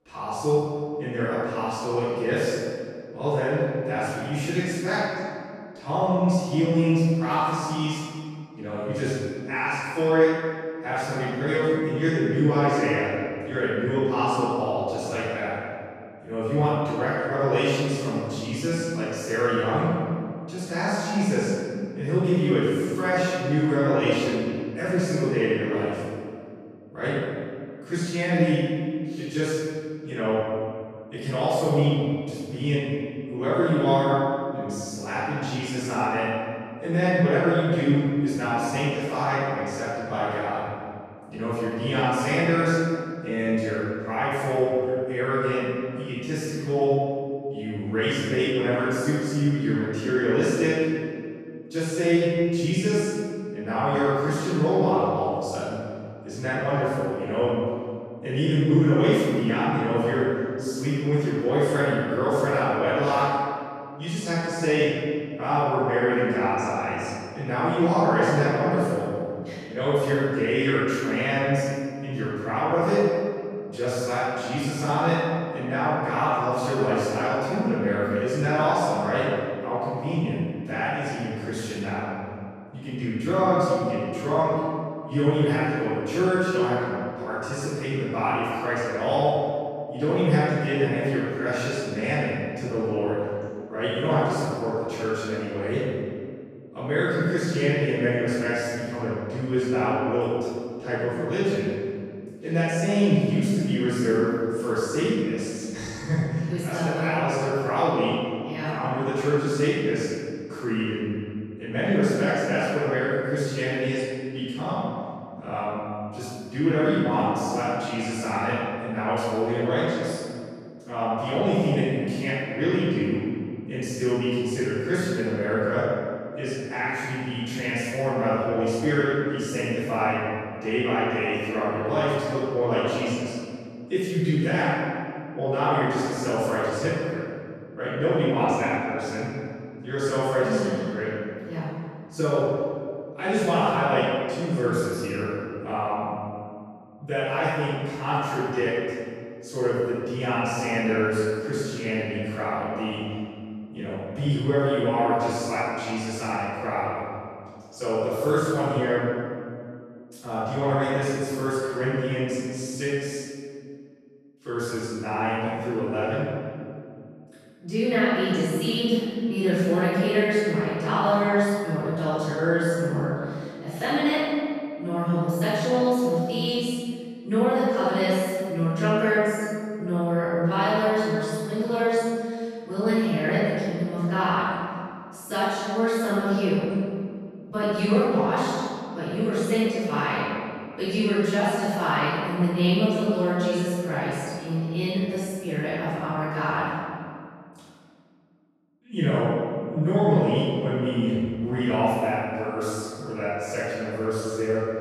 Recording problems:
room echo; strong; dies away in 2.1 s
off-mic speech; far

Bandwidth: 13.5 kHz